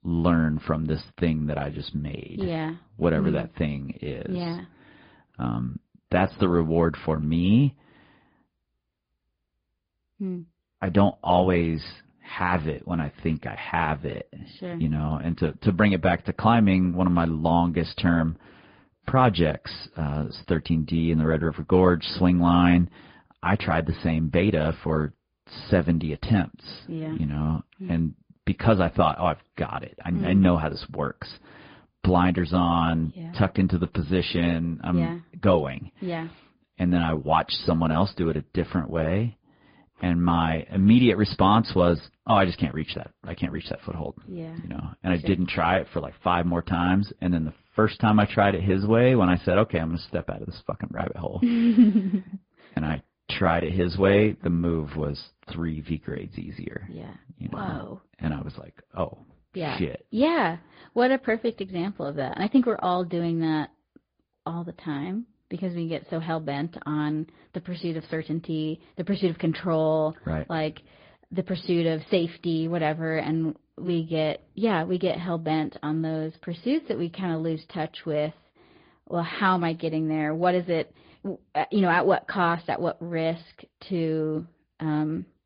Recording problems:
high frequencies cut off; severe; nothing above 5 kHz
garbled, watery; slightly

